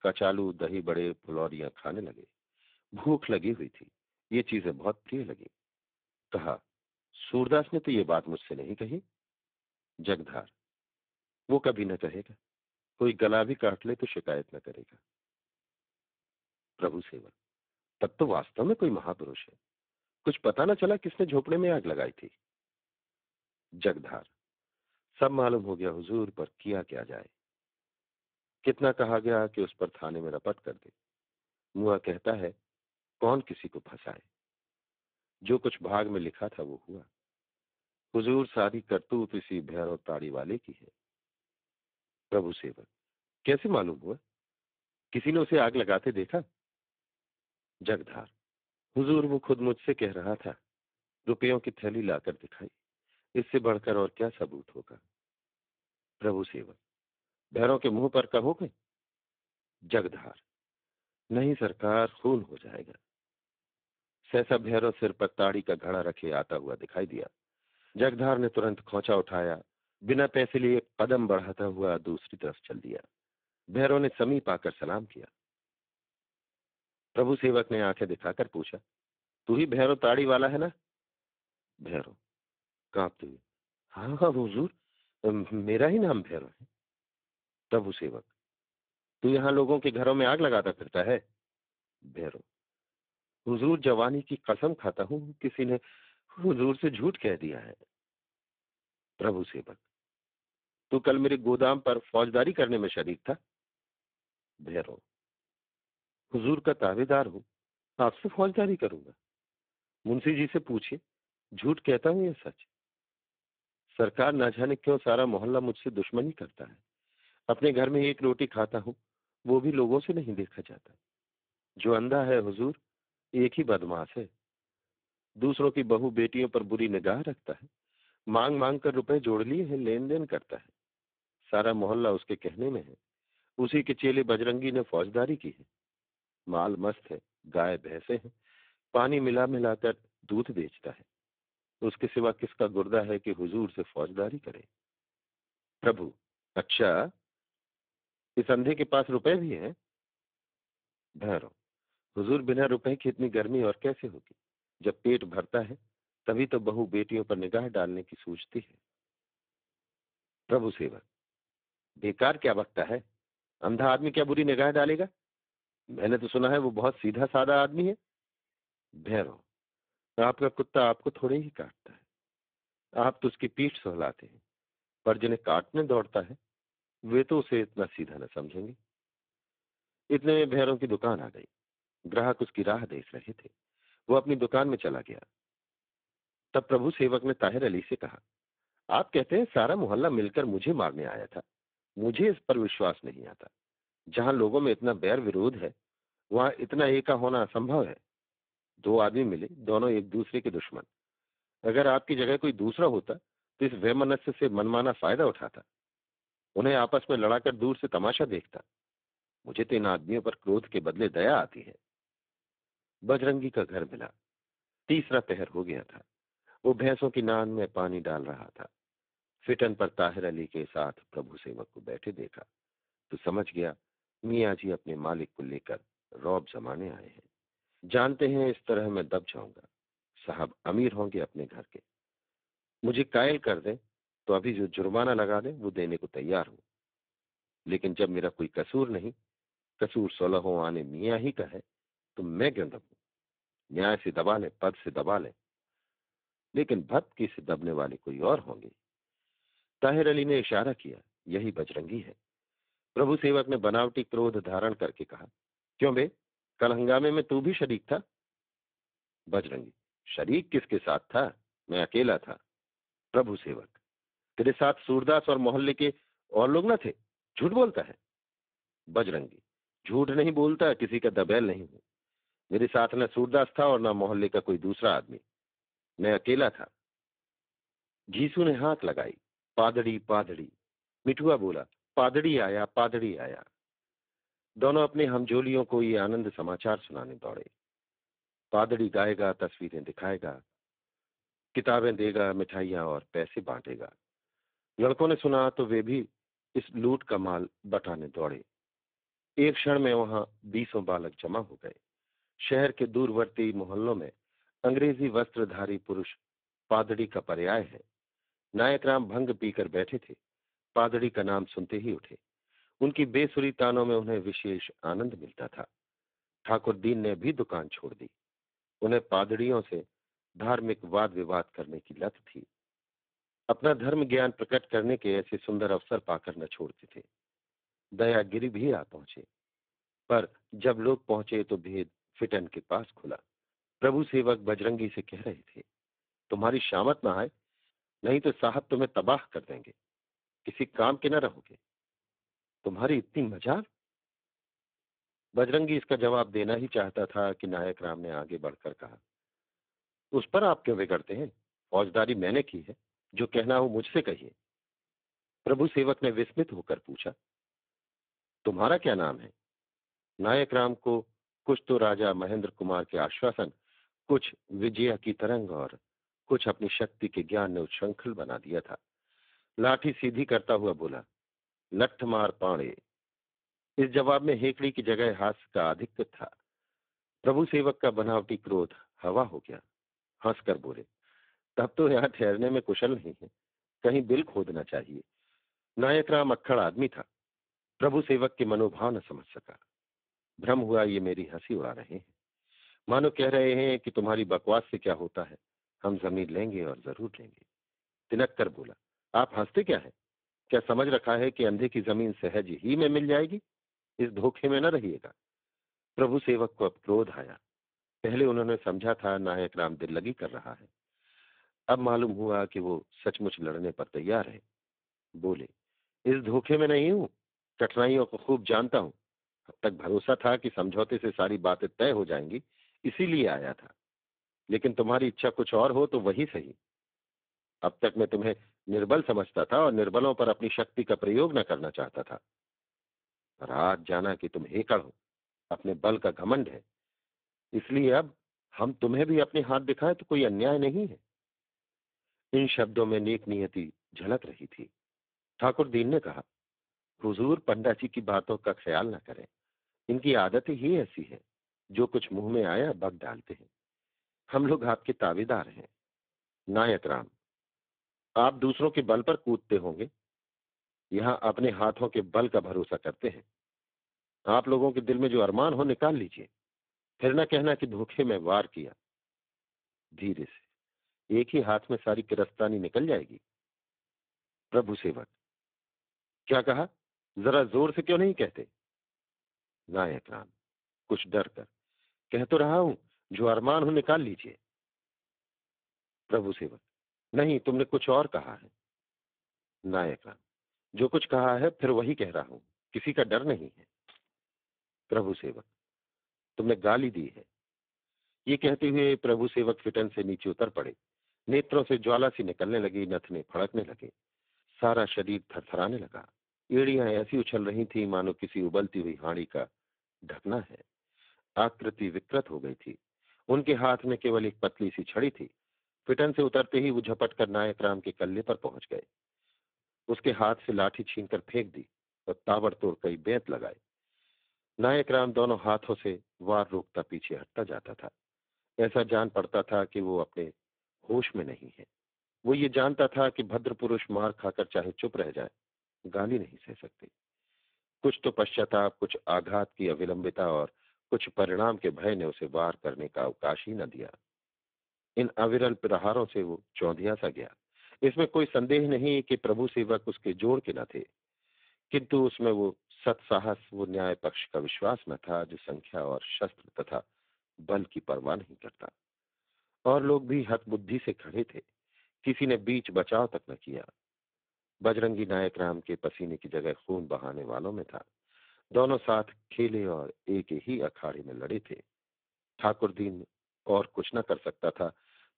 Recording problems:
phone-call audio; poor line
jangling keys; very faint; at 8:14; peak 30 dB below the speech

